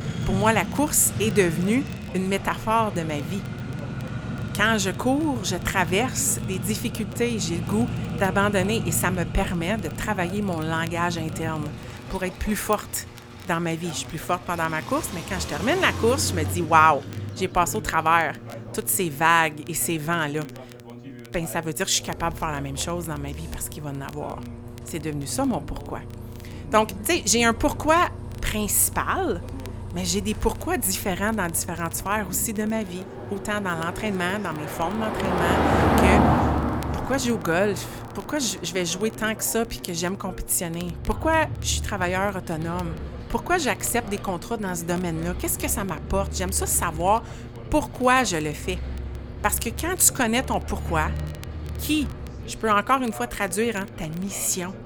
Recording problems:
traffic noise; loud; throughout; 7 dB below the speech
voice in the background; noticeable; throughout; 20 dB below the speech
electrical hum; faint; throughout; 60 Hz, 25 dB below the speech
crackle, like an old record; faint; 30 dB below the speech

